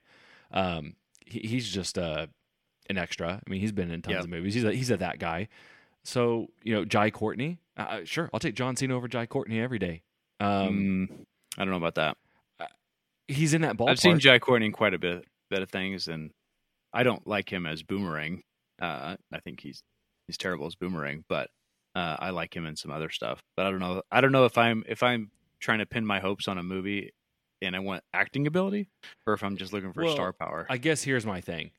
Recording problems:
none

